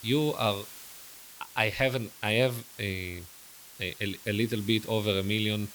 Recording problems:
hiss; noticeable; throughout; 15 dB below the speech

